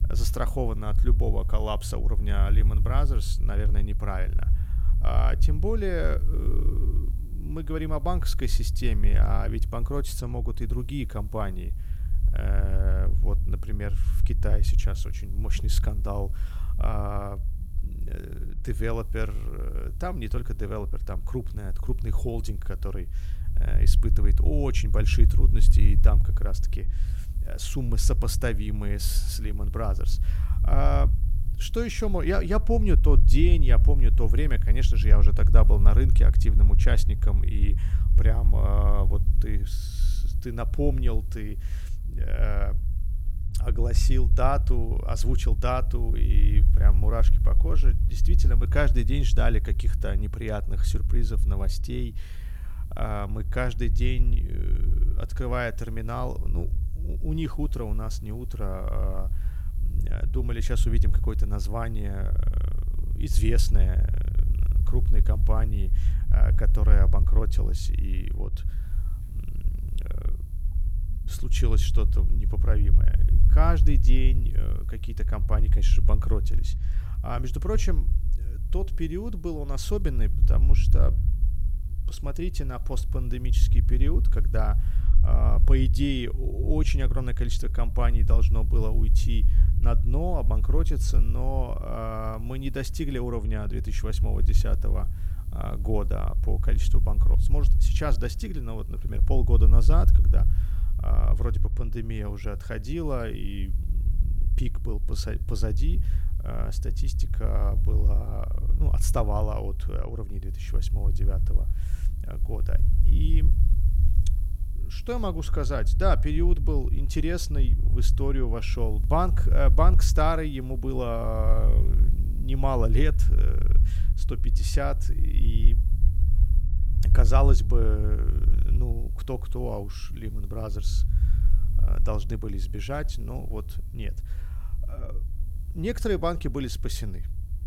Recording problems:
low rumble; noticeable; throughout; 10 dB below the speech
electrical hum; faint; throughout; 60 Hz, 30 dB below the speech

